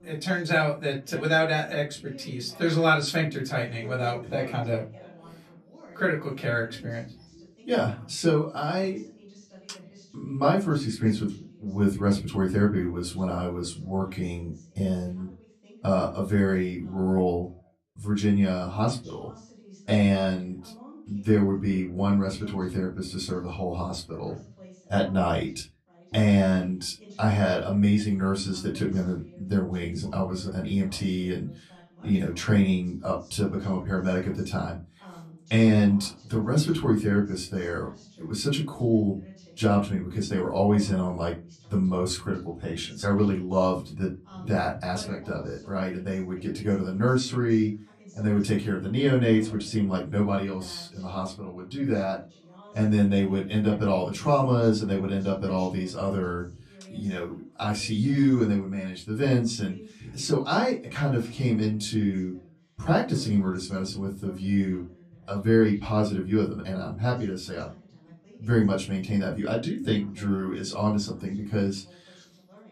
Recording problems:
off-mic speech; far
room echo; very slight; dies away in 0.2 s
voice in the background; faint; throughout; 25 dB below the speech

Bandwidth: 13.5 kHz